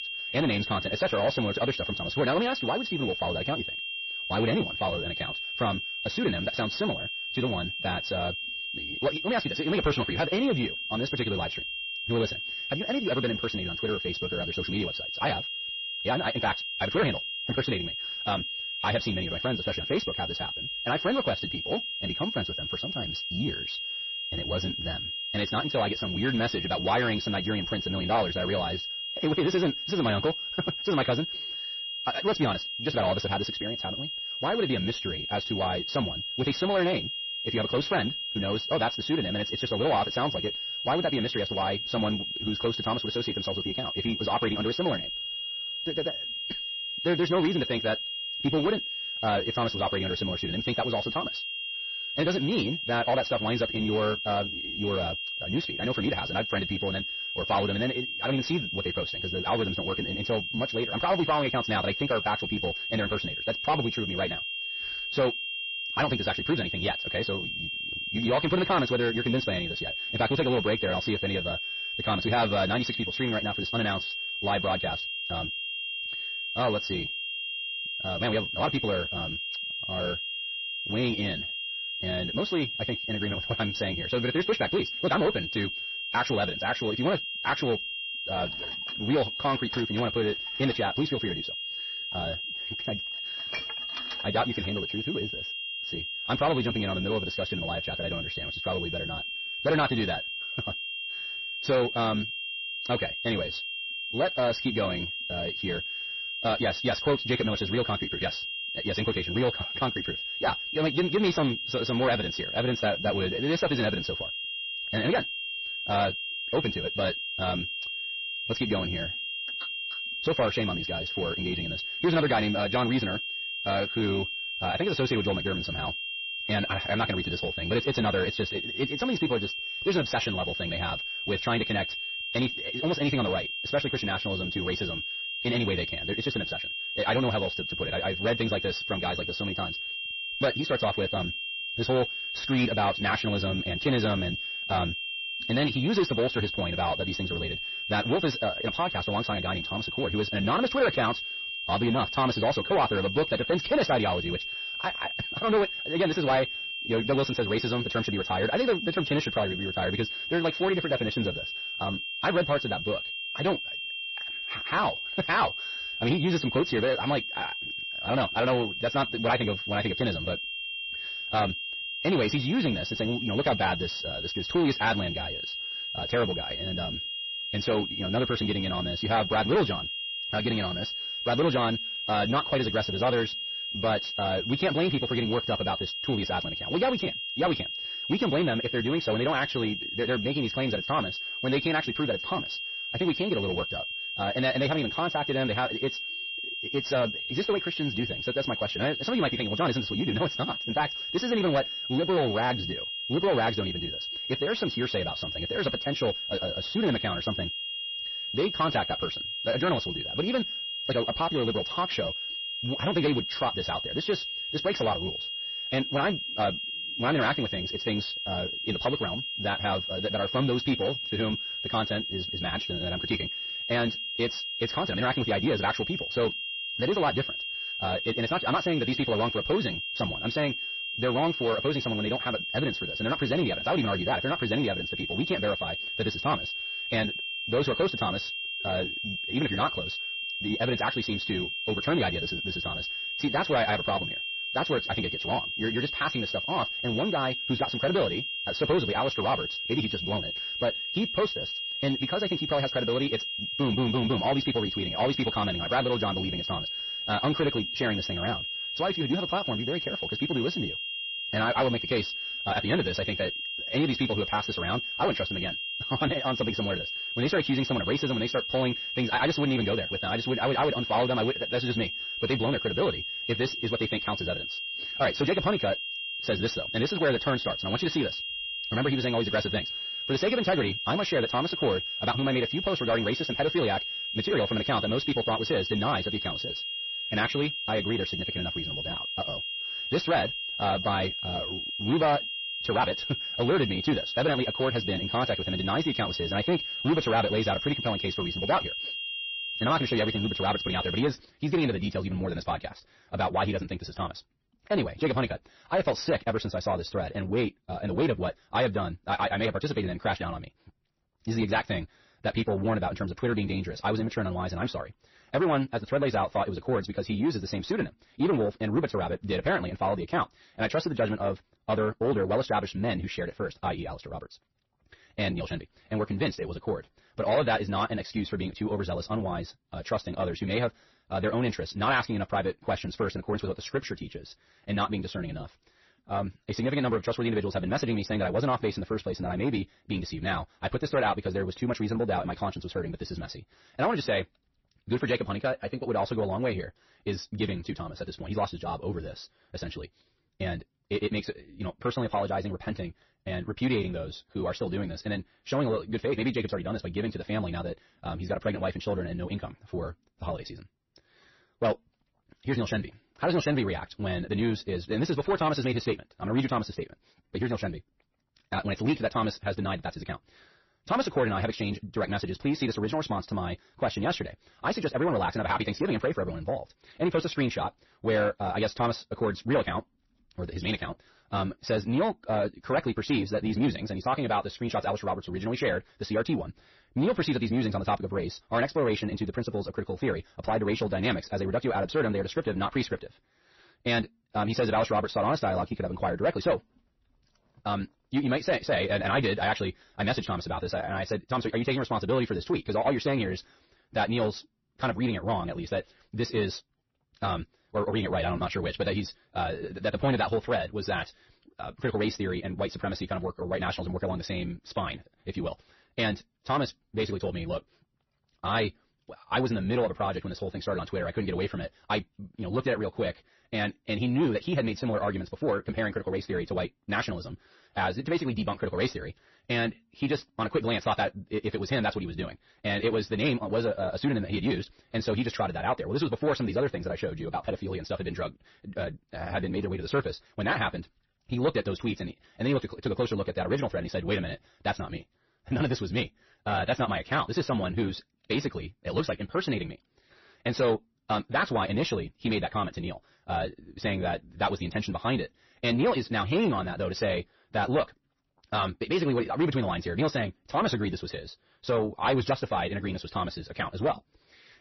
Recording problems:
wrong speed, natural pitch; too fast; 1.6 times normal speed
distortion; slight; 10 dB below the speech
garbled, watery; slightly; nothing above 6 kHz
high-pitched whine; loud; until 5:01; 3 kHz, 3 dB below the speech
clattering dishes; noticeable; from 1:28 to 1:35; peak 8 dB below the speech

